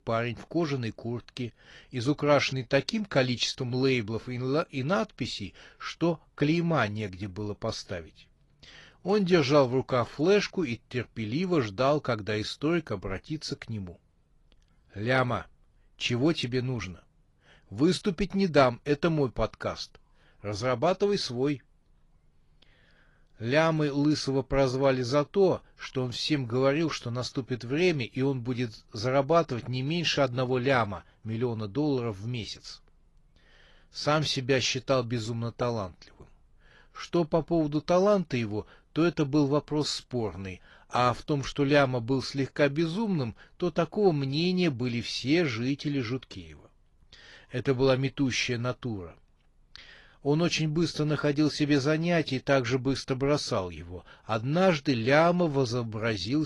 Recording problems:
garbled, watery; slightly; nothing above 11 kHz
abrupt cut into speech; at the end

